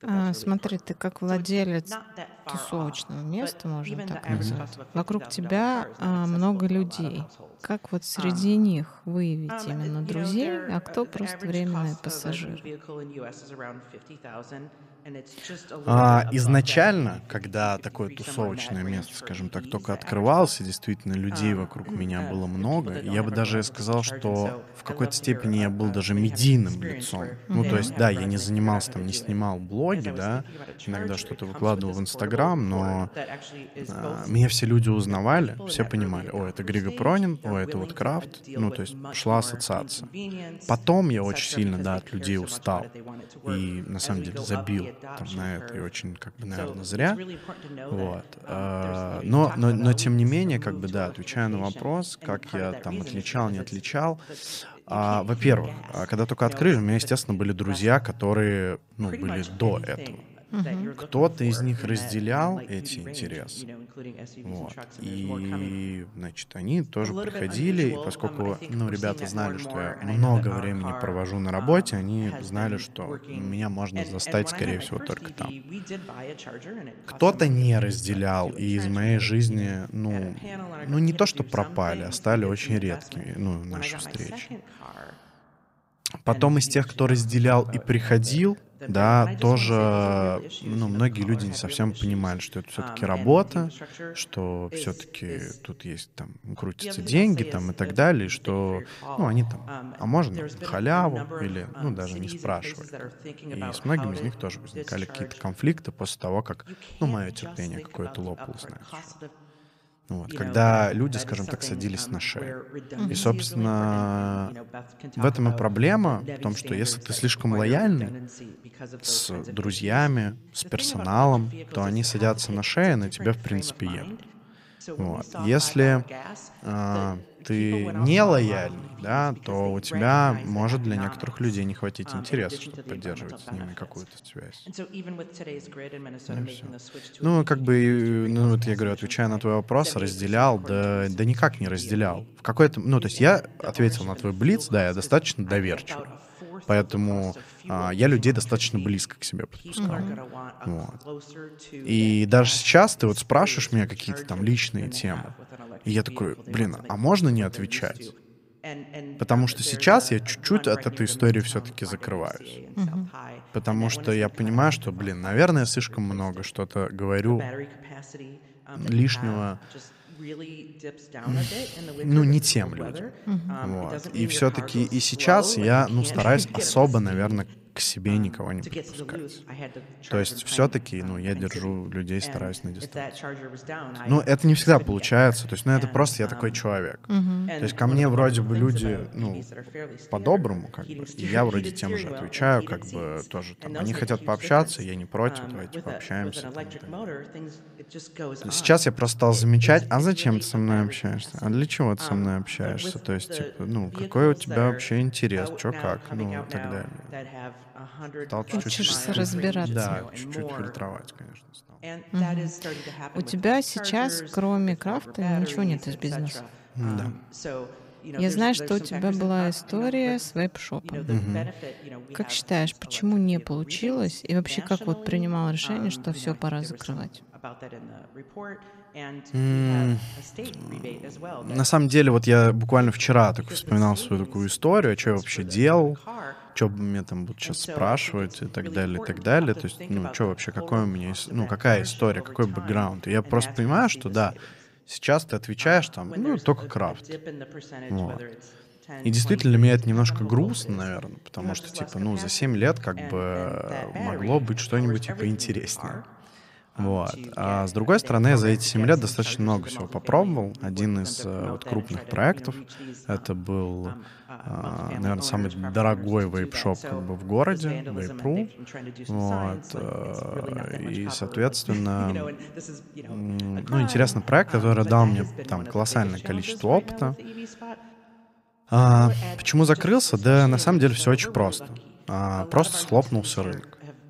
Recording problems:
voice in the background; noticeable; throughout; 15 dB below the speech

